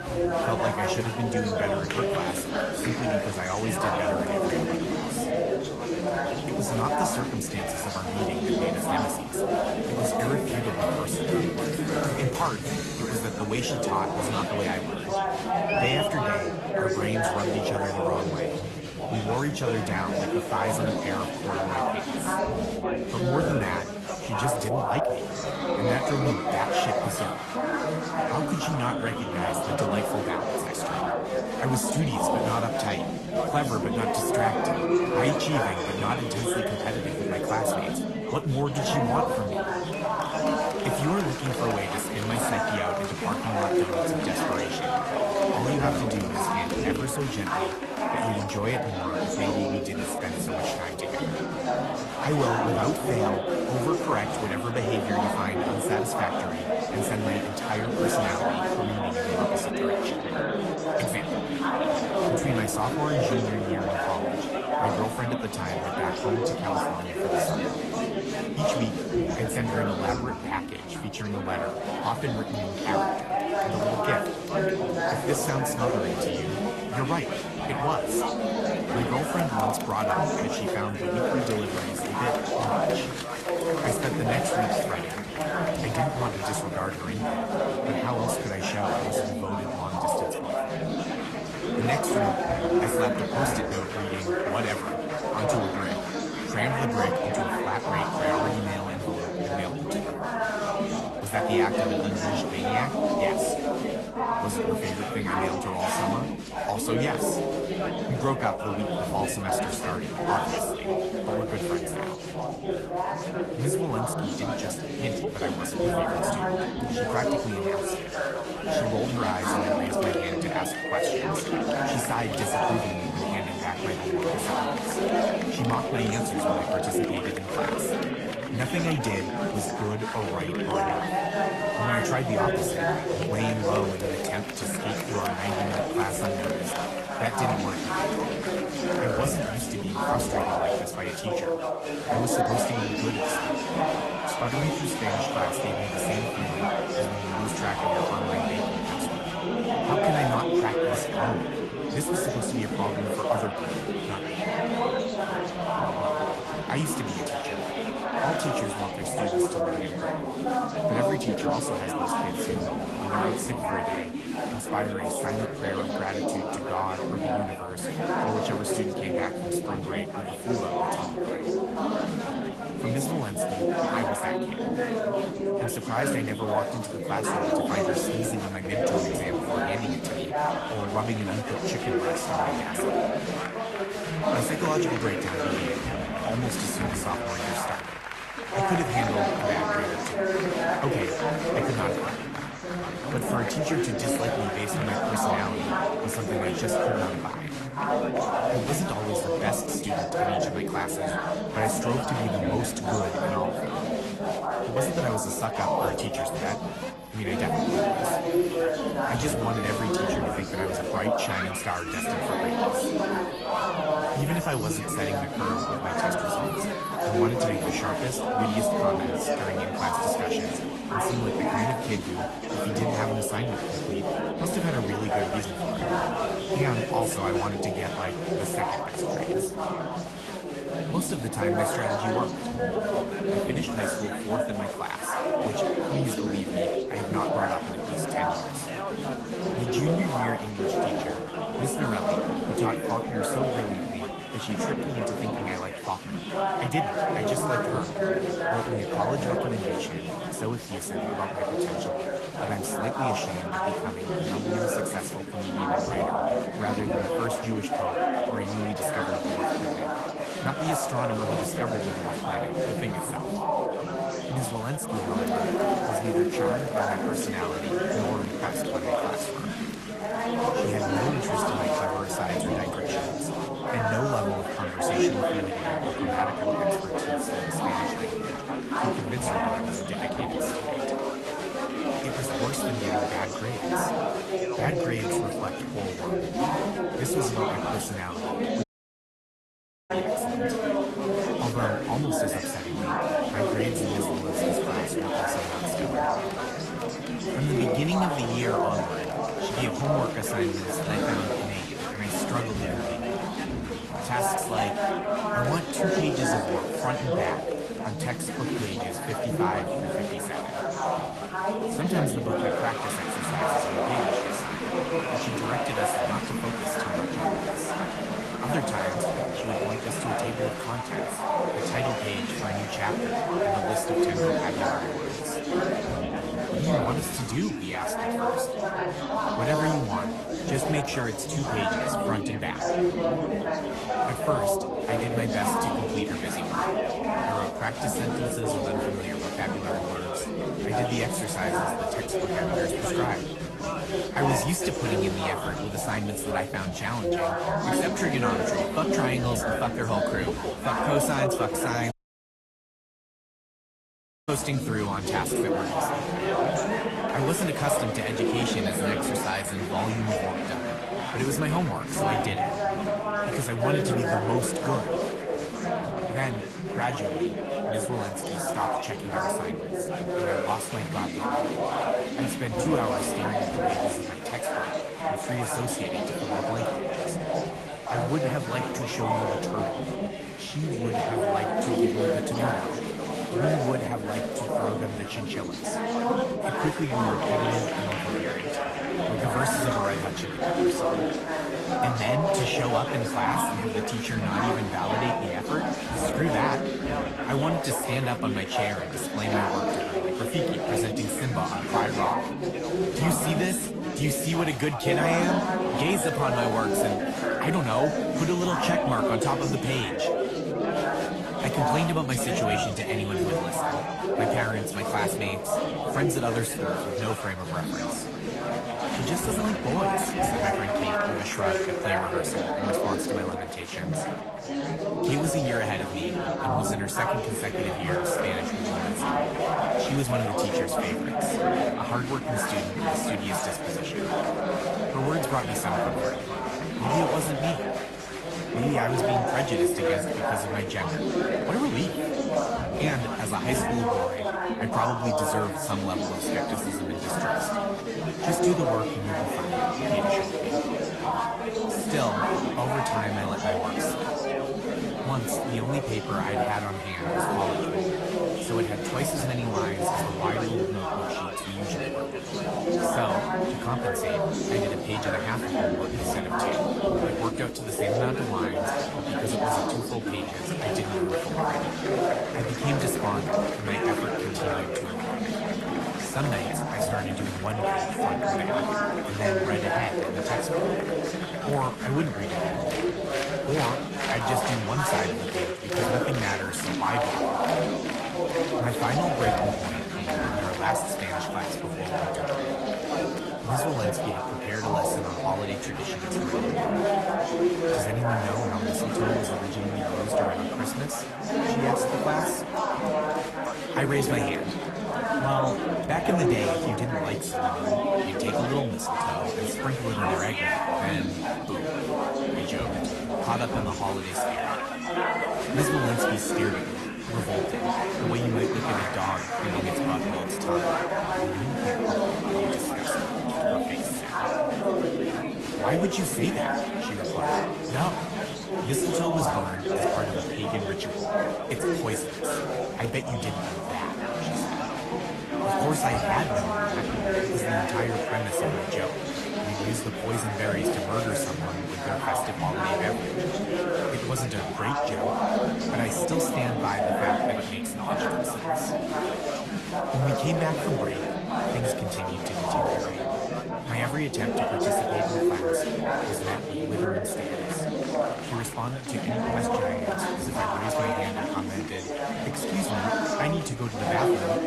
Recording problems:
garbled, watery; slightly; nothing above 12 kHz
chatter from many people; very loud; throughout; 4 dB above the speech
audio cutting out; at 4:49 for 1.5 s and at 5:52 for 2.5 s

